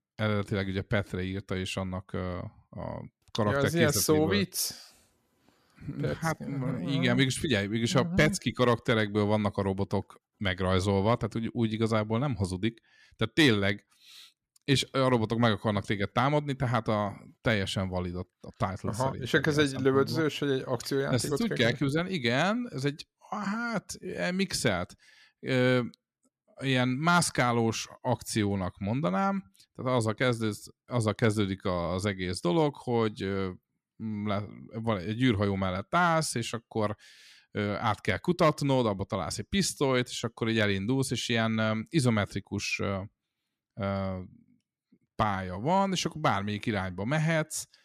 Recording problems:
none

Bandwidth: 14.5 kHz